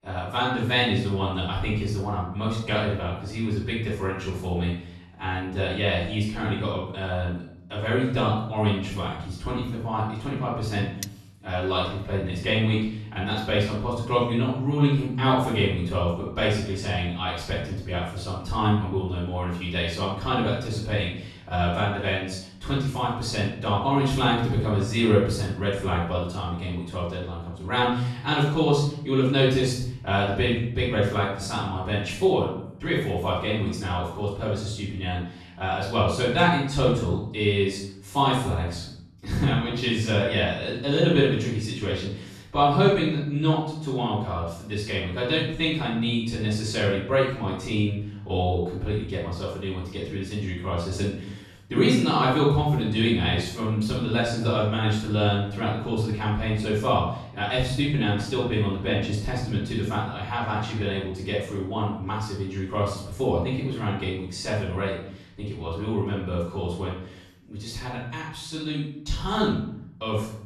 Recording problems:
off-mic speech; far
room echo; noticeable; dies away in 0.7 s
clattering dishes; very faint; at 11 s; peak 10 dB below the speech

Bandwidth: 13.5 kHz